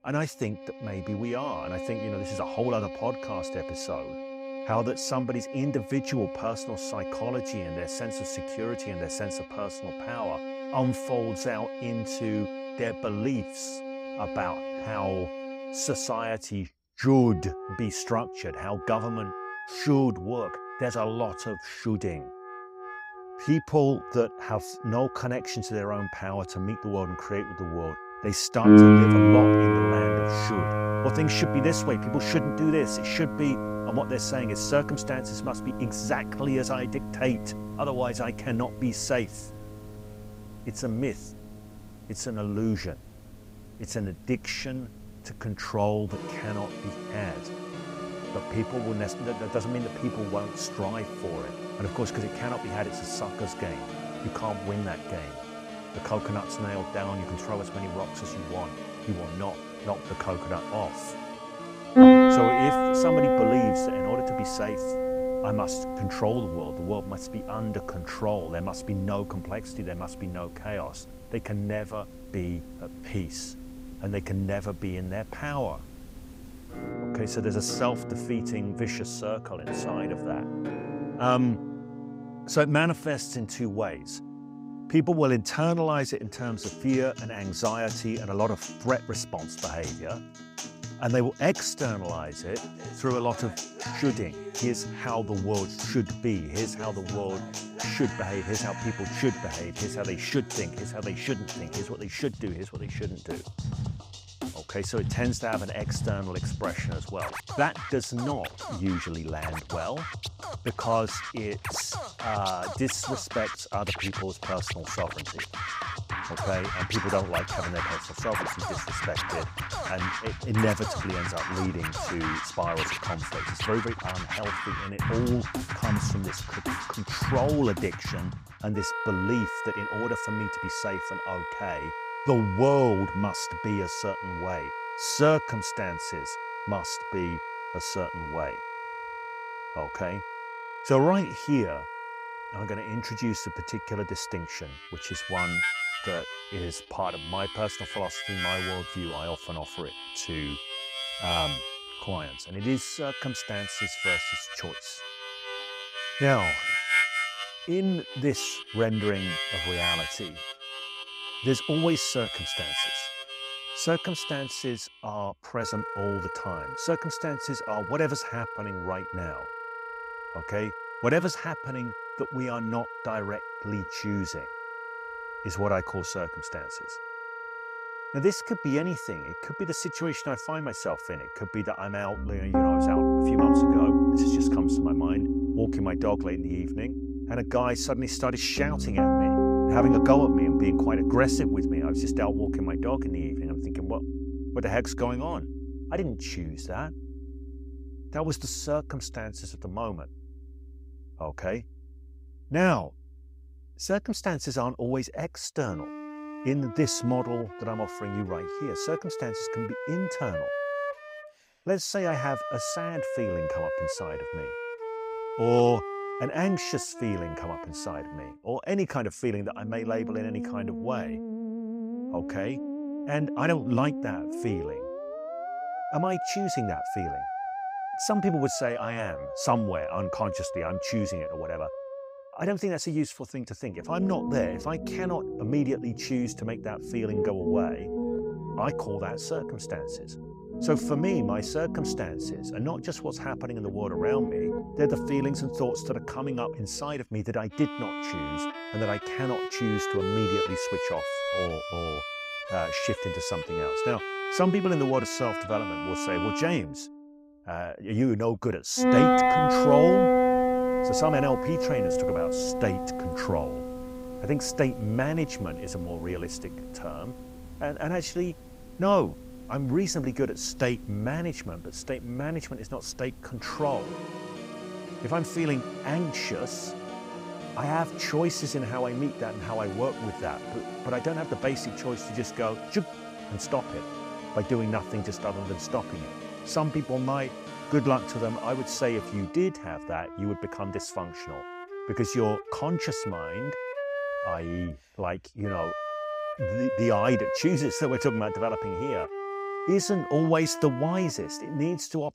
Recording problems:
background music; very loud; throughout; as loud as the speech

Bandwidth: 15.5 kHz